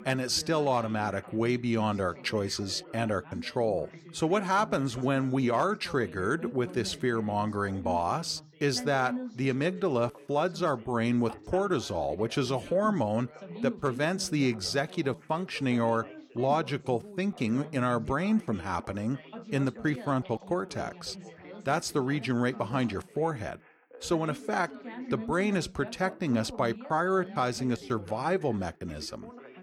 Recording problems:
background chatter; noticeable; throughout; 3 voices, 15 dB below the speech

